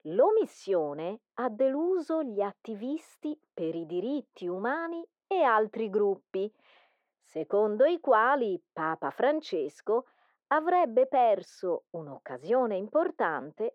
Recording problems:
muffled; very; fading above 3.5 kHz
thin; somewhat; fading below 500 Hz

